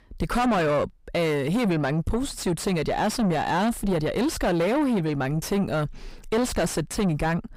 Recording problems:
distortion; heavy; 5 dB below the speech

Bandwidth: 15.5 kHz